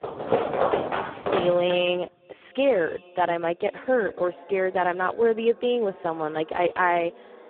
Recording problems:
phone-call audio; poor line; nothing above 3 kHz
echo of what is said; faint; throughout; 510 ms later, 25 dB below the speech
muffled; very slightly; fading above 2.5 kHz
household noises; loud; until 1.5 s; 2 dB below the speech

